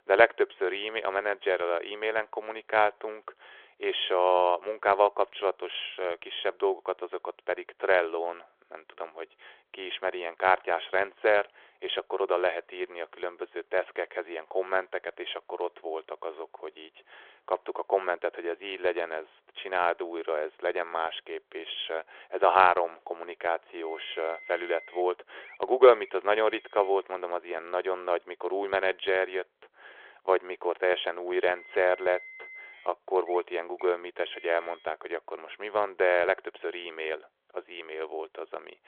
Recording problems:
phone-call audio; nothing above 3.5 kHz
traffic noise; noticeable; throughout; 20 dB below the speech

